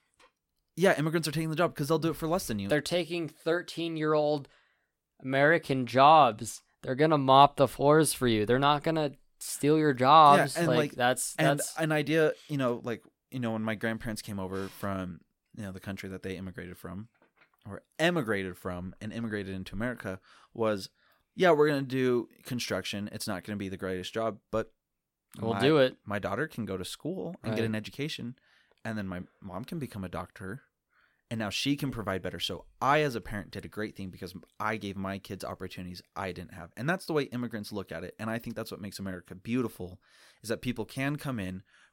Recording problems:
none

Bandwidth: 16.5 kHz